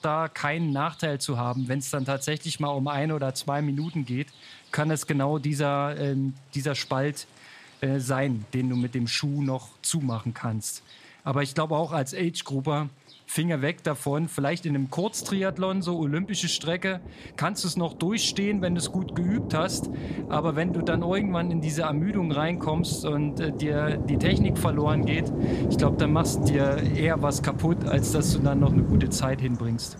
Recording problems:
rain or running water; loud; throughout; 1 dB below the speech

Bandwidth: 14.5 kHz